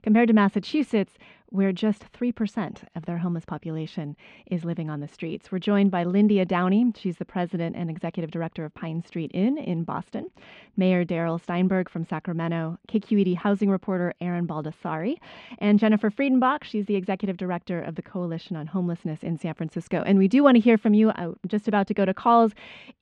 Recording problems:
muffled; slightly; fading above 3.5 kHz

